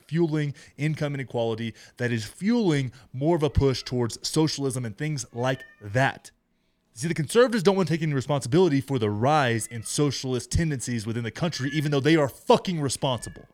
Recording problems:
animal sounds; faint; throughout; 20 dB below the speech

